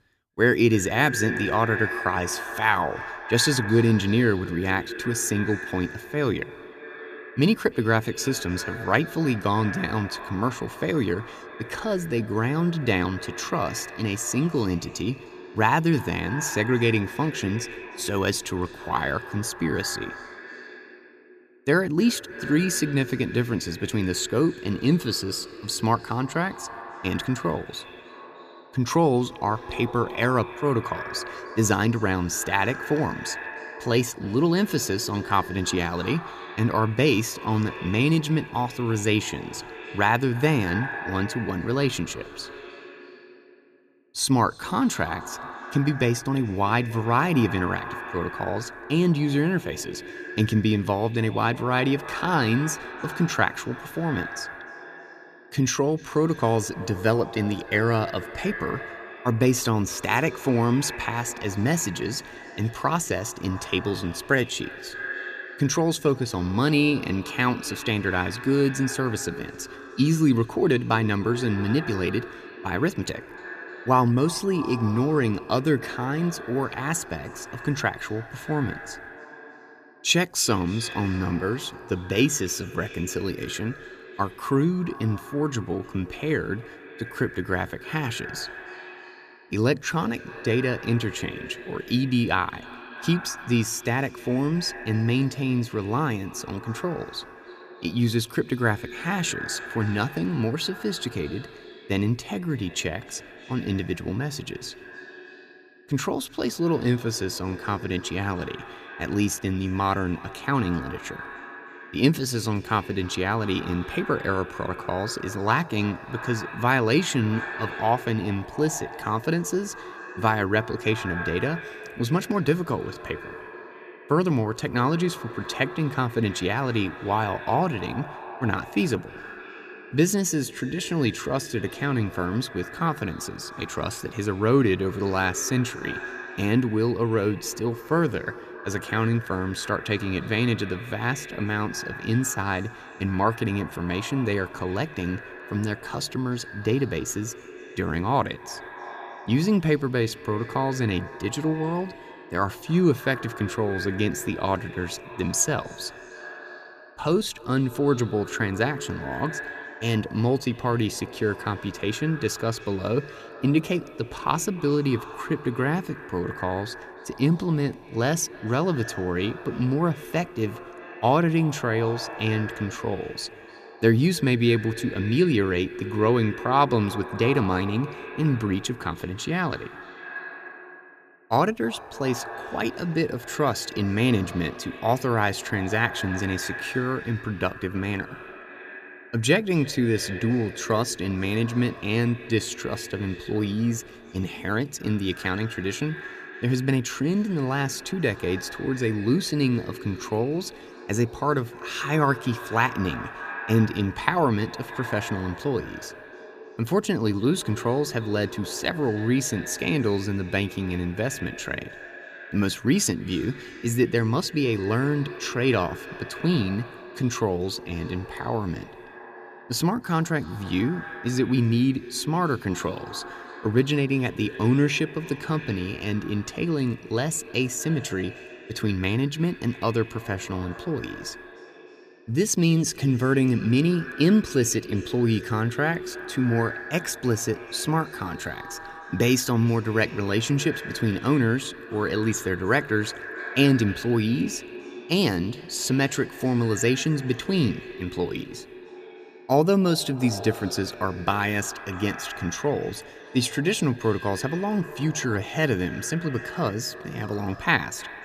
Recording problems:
echo of what is said; noticeable; throughout; 300 ms later, 15 dB below the speech

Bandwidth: 14.5 kHz